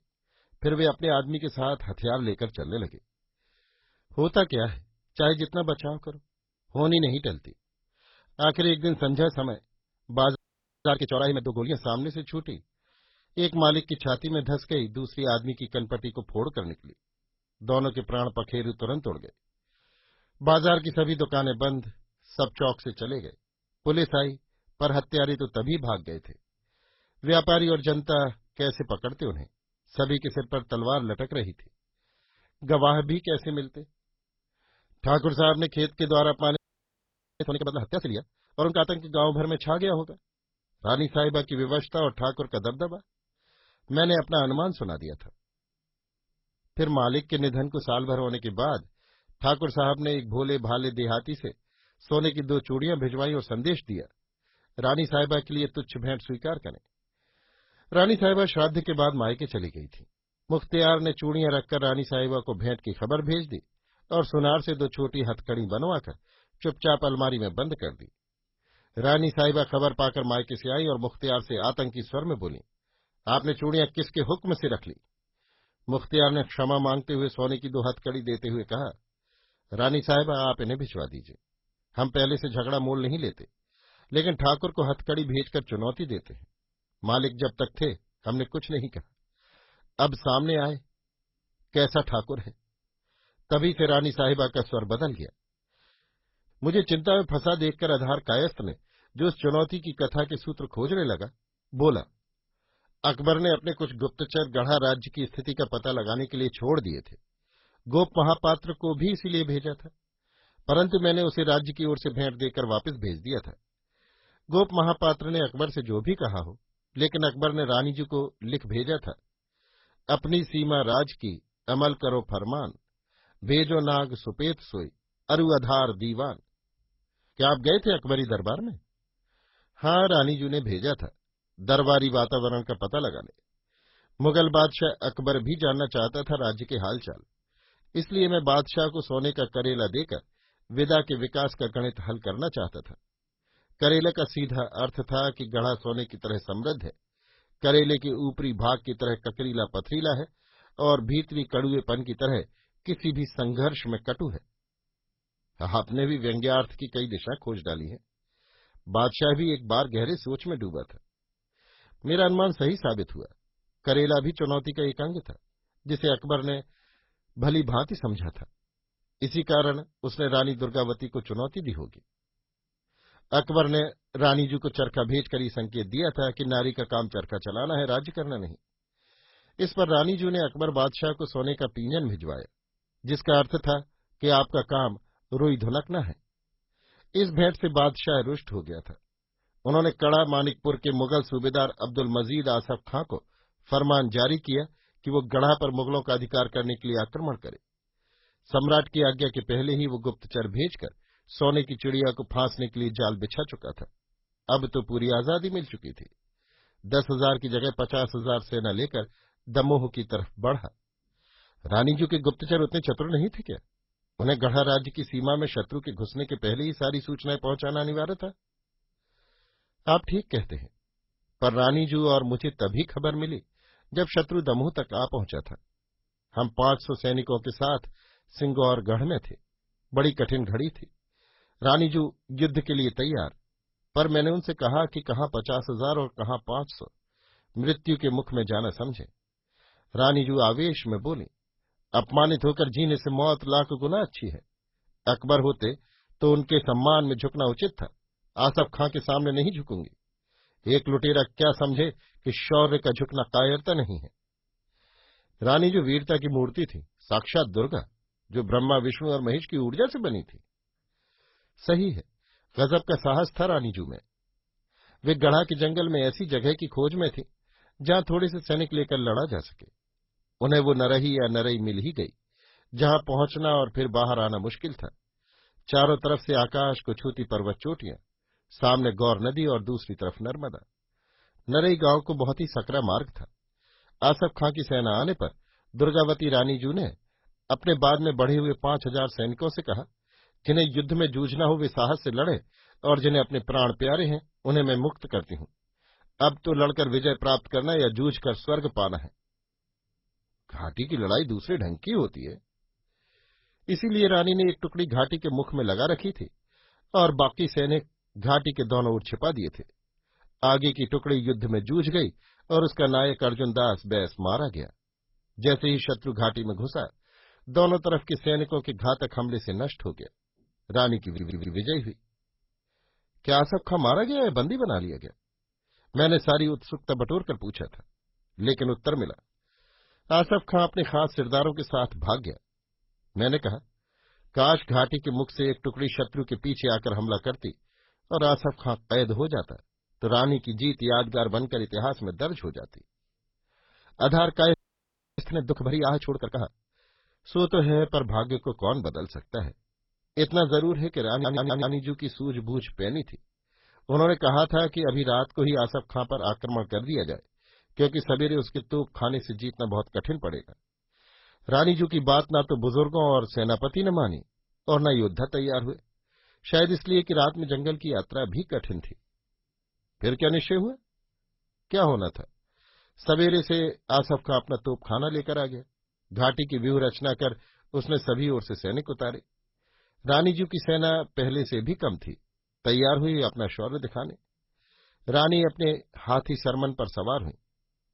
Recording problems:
garbled, watery; badly; nothing above 5.5 kHz
audio freezing; at 10 s, at 37 s for 1 s and at 5:45 for 0.5 s
audio stuttering; at 5:21 and at 5:51

